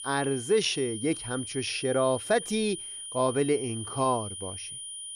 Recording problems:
high-pitched whine; loud; throughout; 9.5 kHz, 8 dB below the speech

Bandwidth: 15.5 kHz